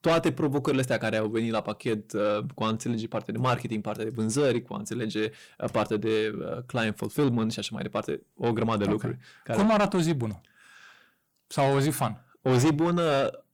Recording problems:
distortion; heavy; 7 dB below the speech

